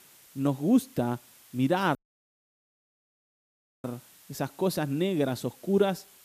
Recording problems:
hiss; faint; throughout; 25 dB below the speech
audio cutting out; at 2 s for 2 s

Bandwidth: 14.5 kHz